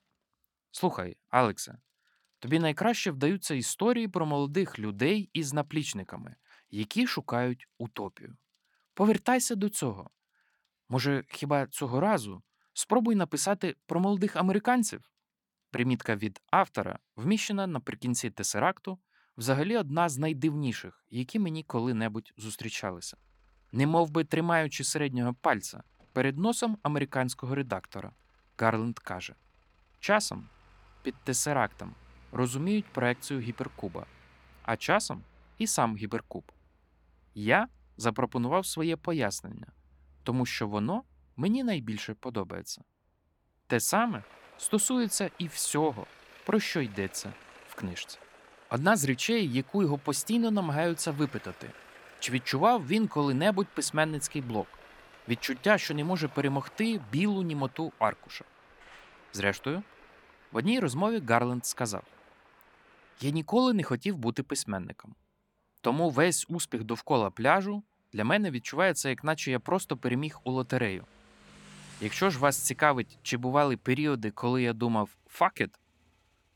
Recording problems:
traffic noise; faint; throughout; 25 dB below the speech

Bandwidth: 17.5 kHz